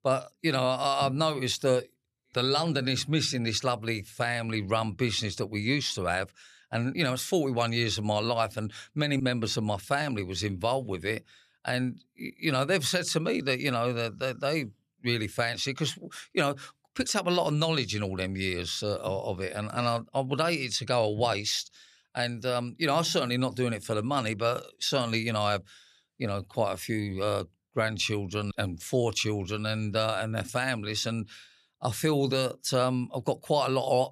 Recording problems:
none

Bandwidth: 13.5 kHz